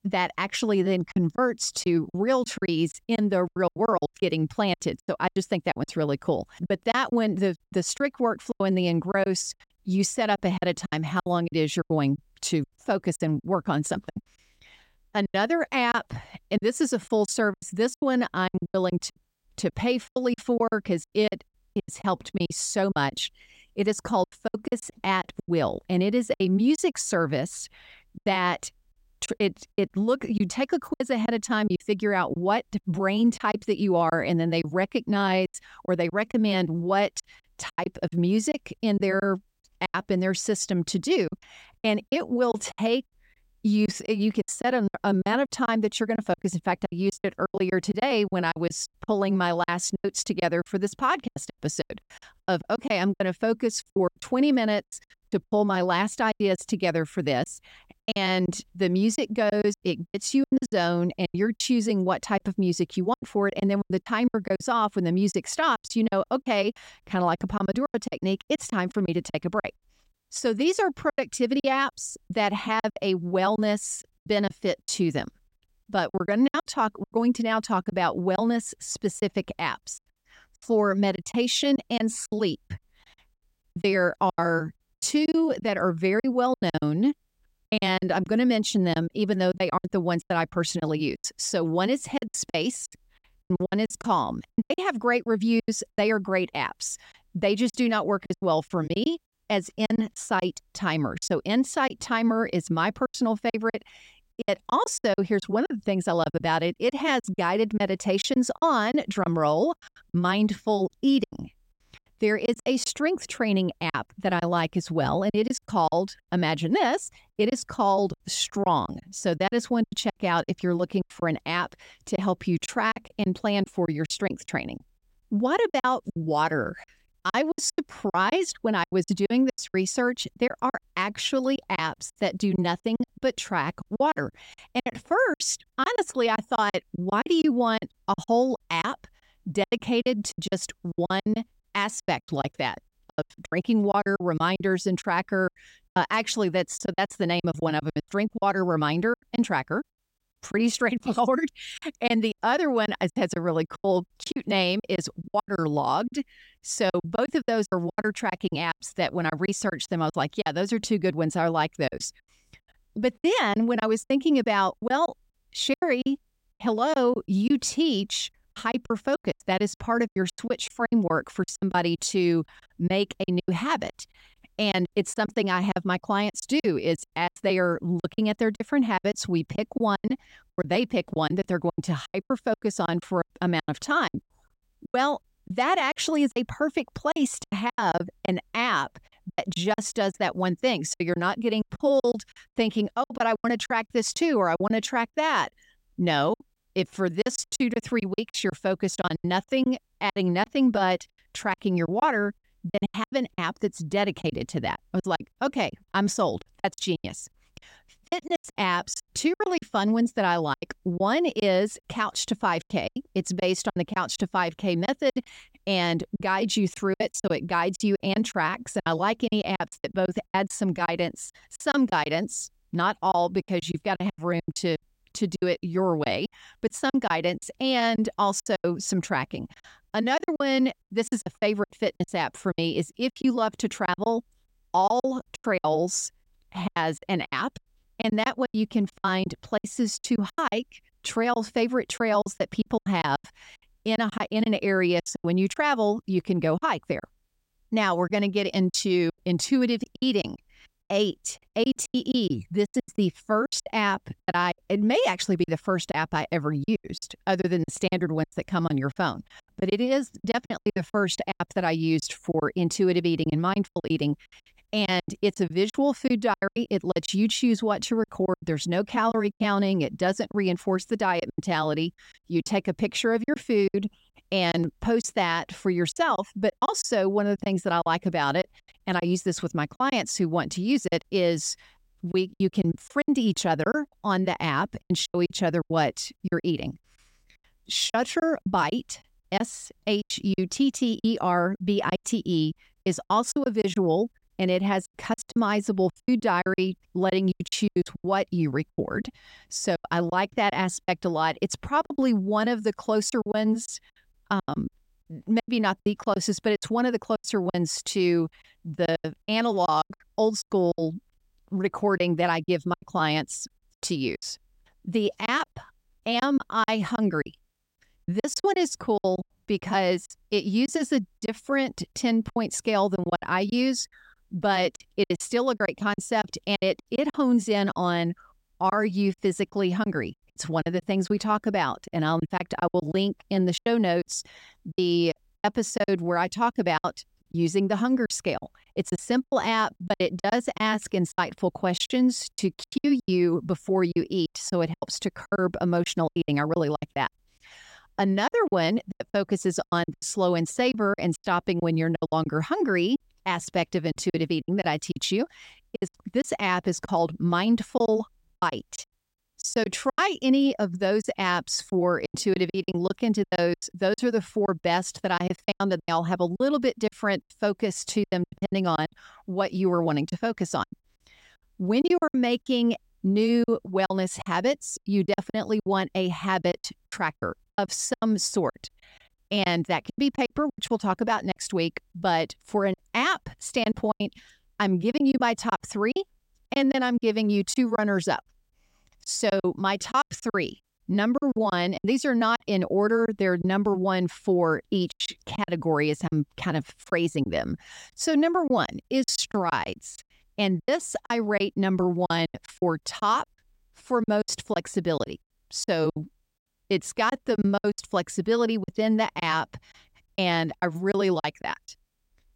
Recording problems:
choppy; very; 13% of the speech affected

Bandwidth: 16 kHz